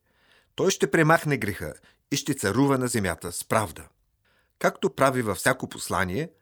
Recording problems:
none

